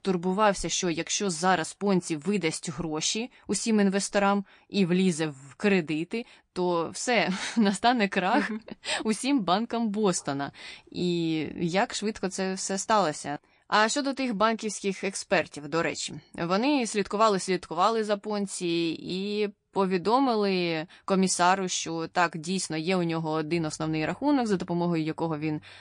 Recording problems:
garbled, watery; slightly

